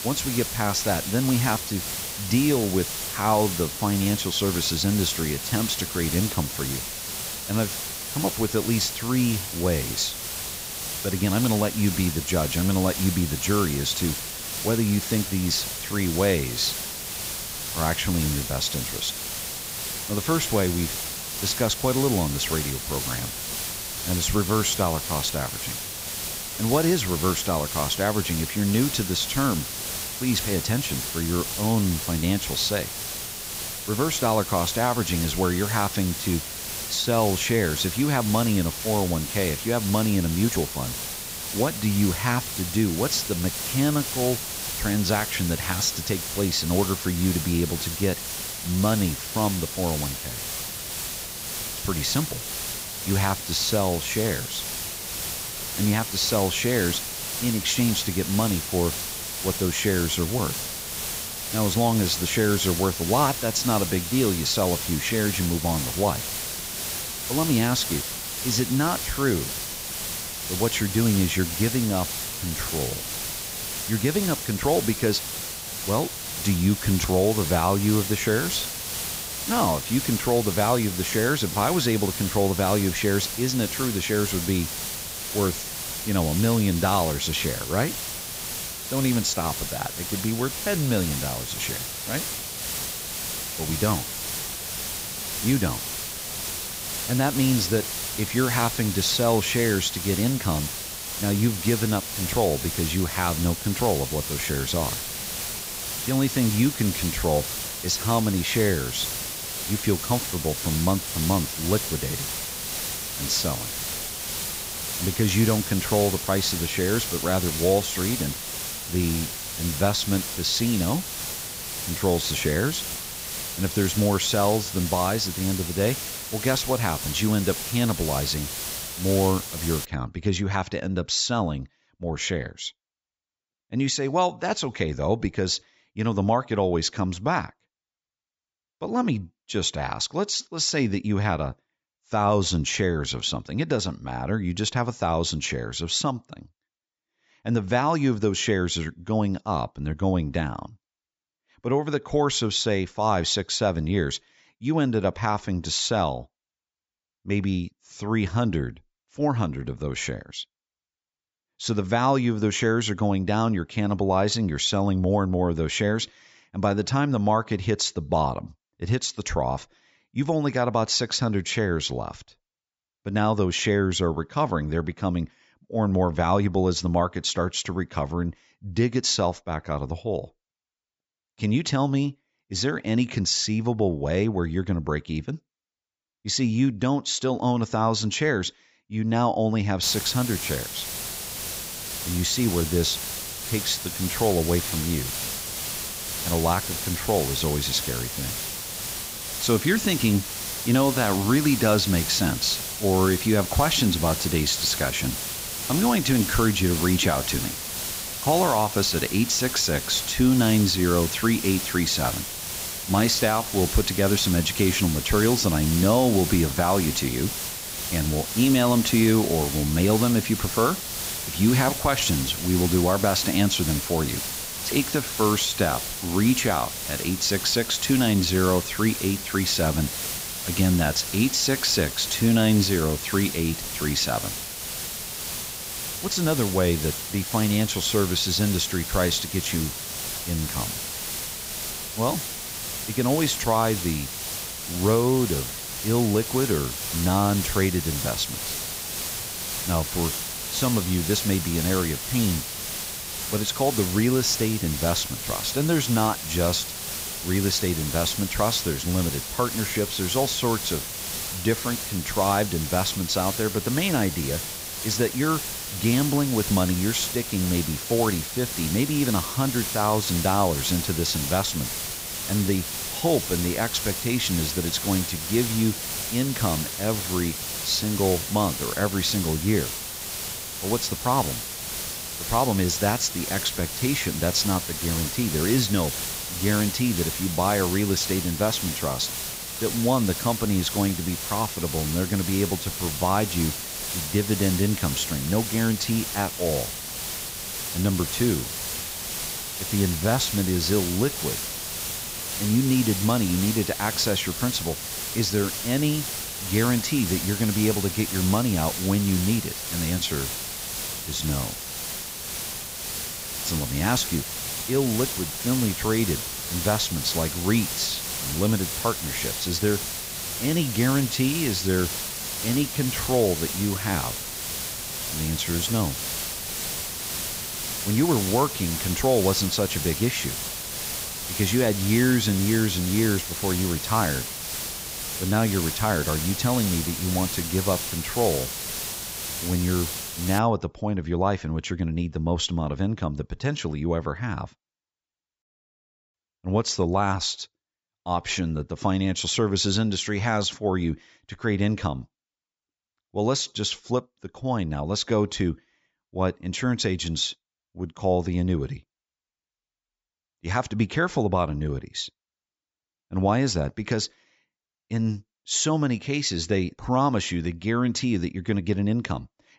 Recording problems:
high frequencies cut off; noticeable; nothing above 8 kHz
hiss; loud; until 2:10 and from 3:10 to 5:40; 4 dB below the speech

